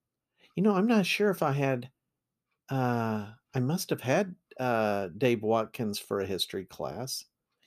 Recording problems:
none

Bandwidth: 14.5 kHz